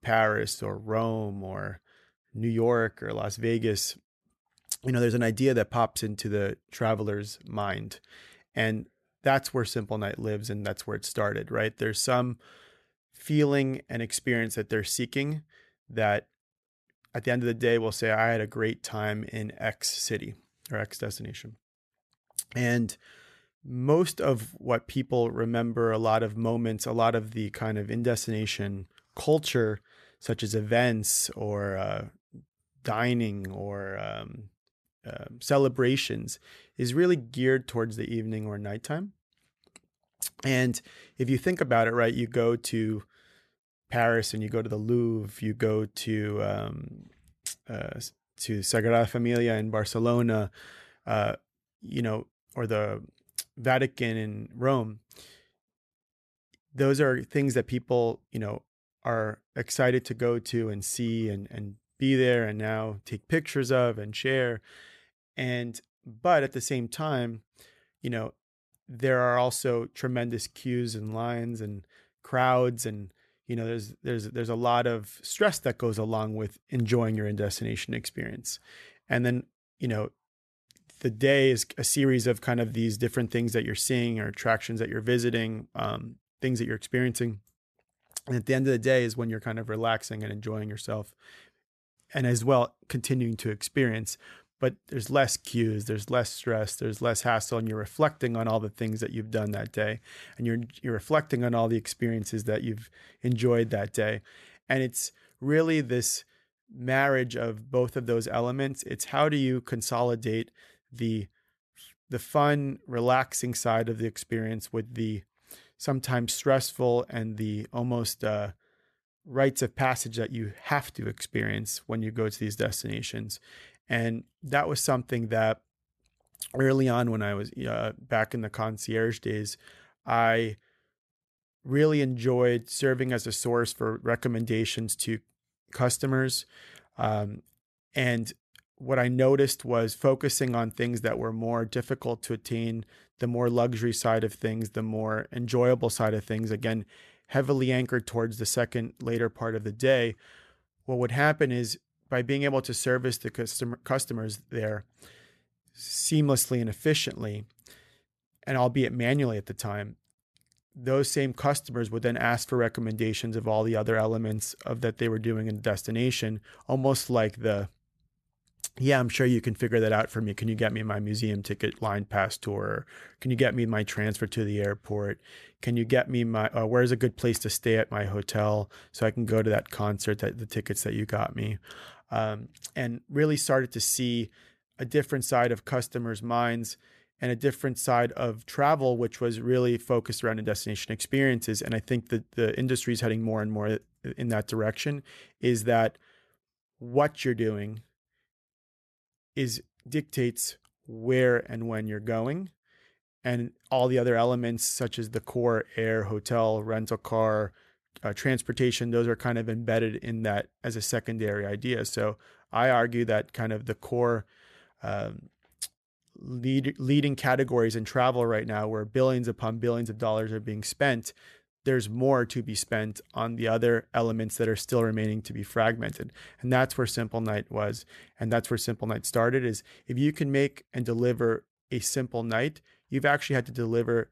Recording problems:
none

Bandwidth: 13.5 kHz